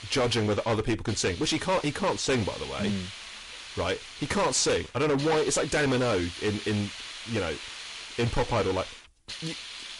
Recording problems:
distortion; heavy; 11% of the sound clipped
garbled, watery; slightly; nothing above 10.5 kHz
hiss; noticeable; throughout; 10 dB below the speech

